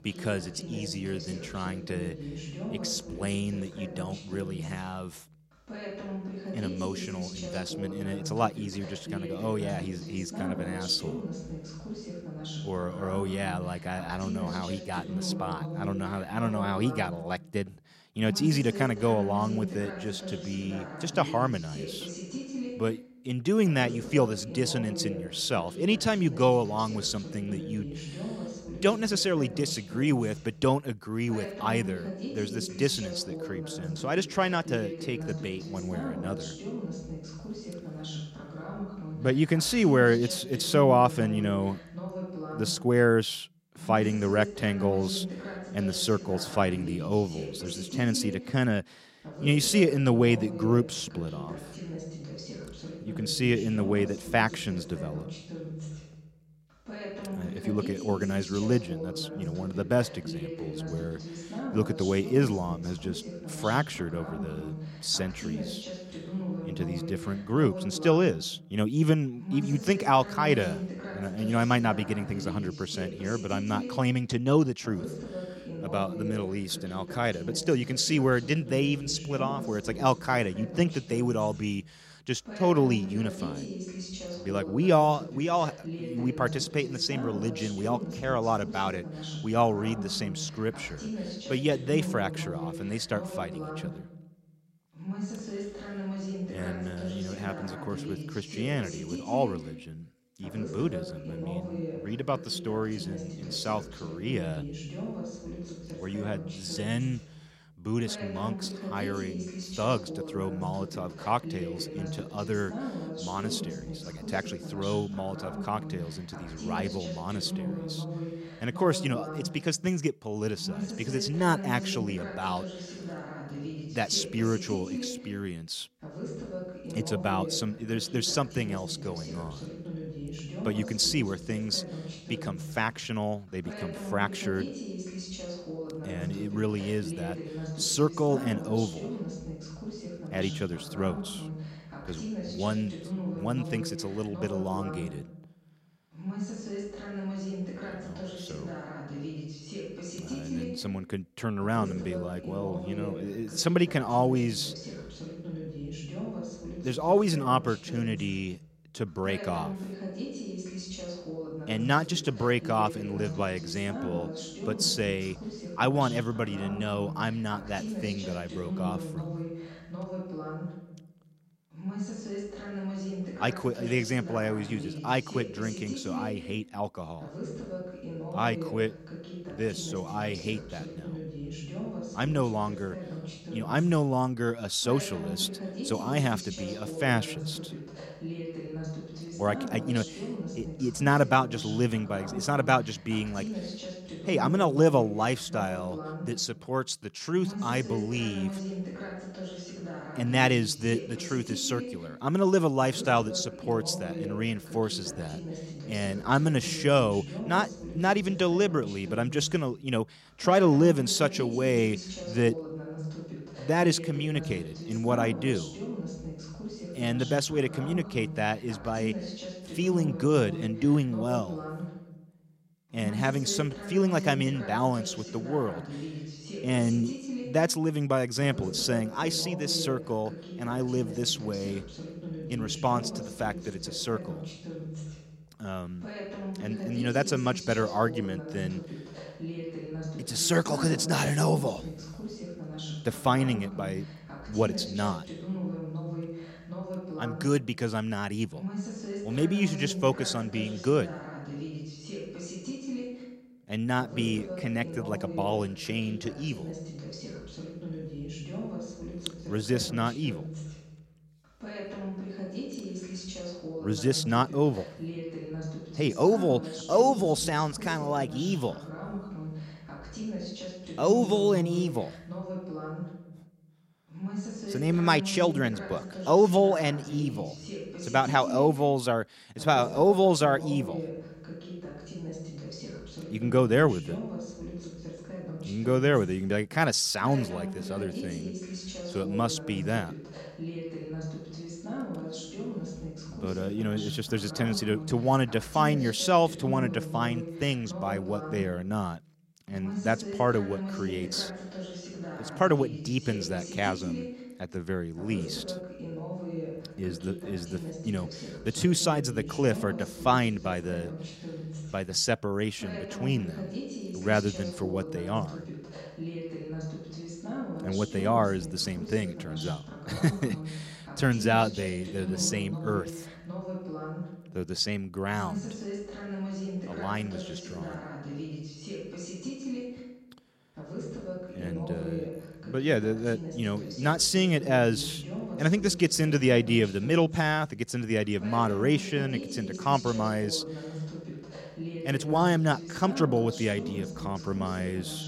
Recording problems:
voice in the background; loud; throughout; 9 dB below the speech

